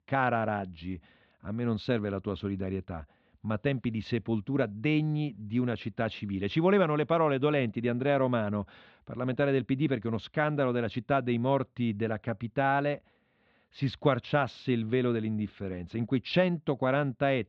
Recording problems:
muffled; slightly; fading above 4 kHz

